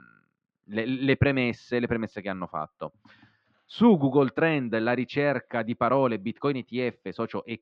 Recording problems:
muffled; slightly; fading above 3.5 kHz

